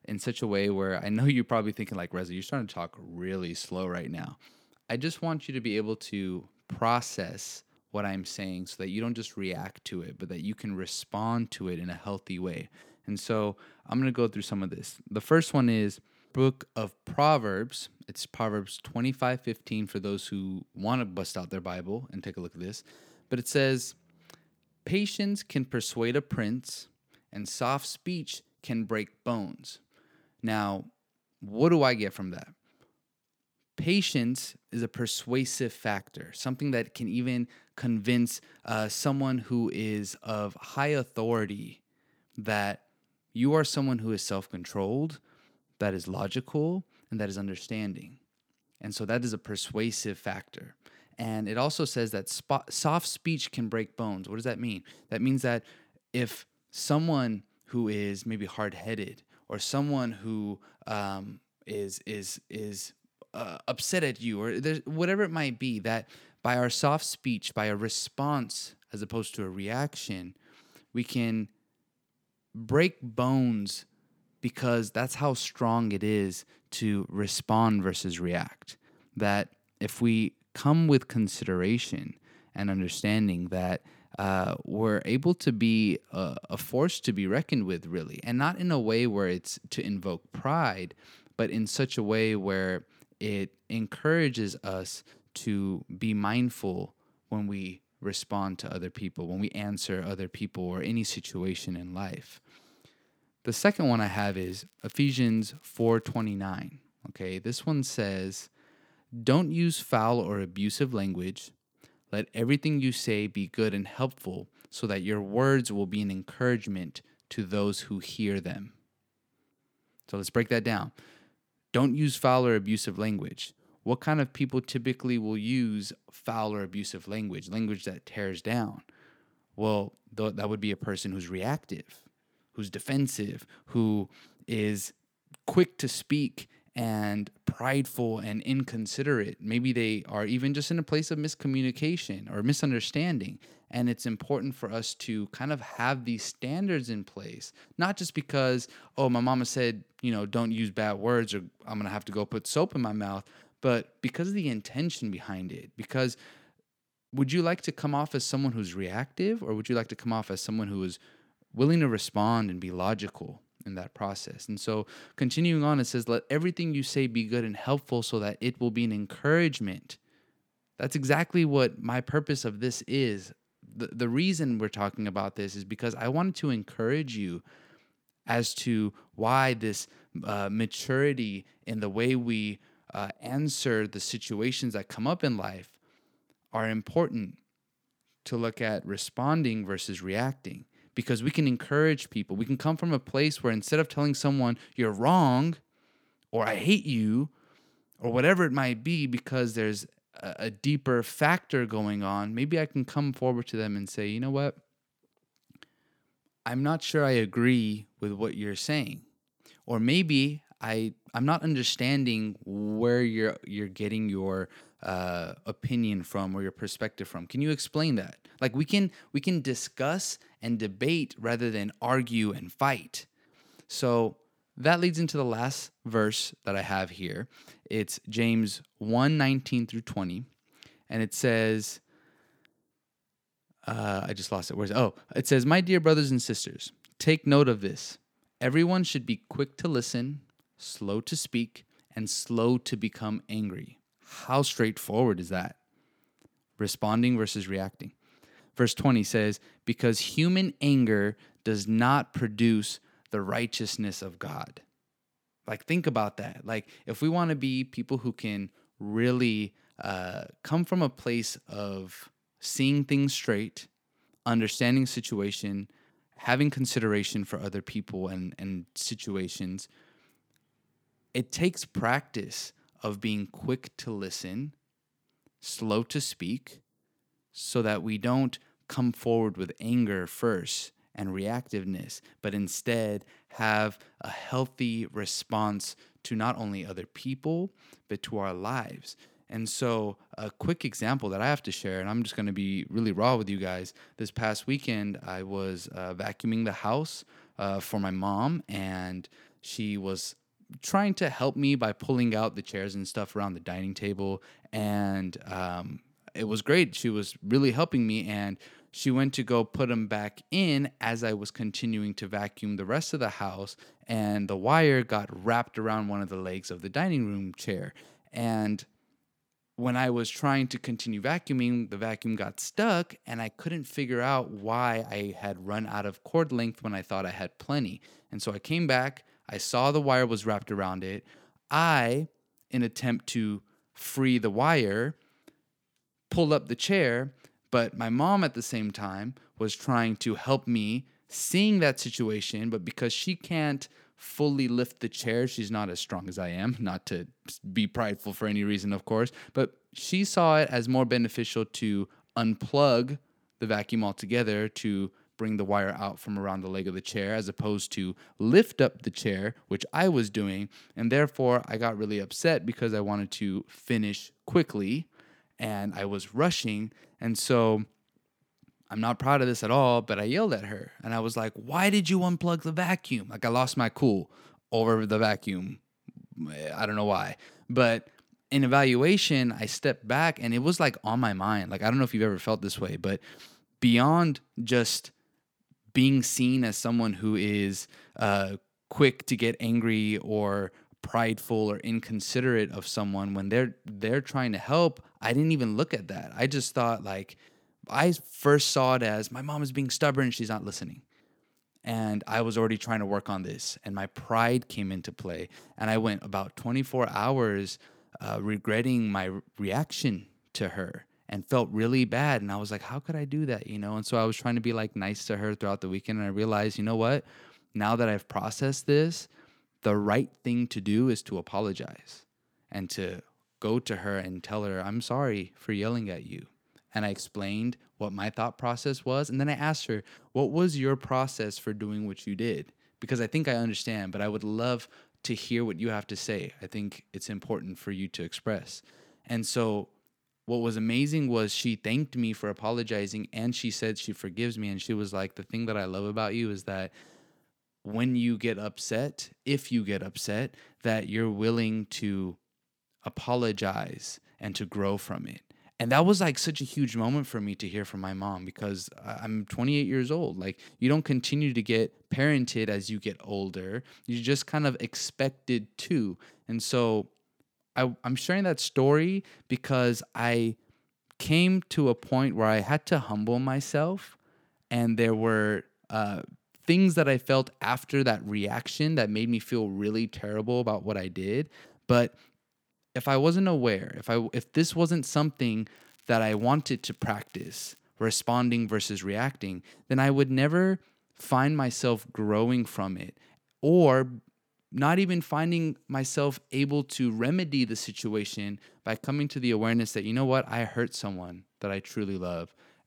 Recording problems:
crackling; faint; from 1:44 to 1:46 and from 8:06 to 8:08; 30 dB below the speech

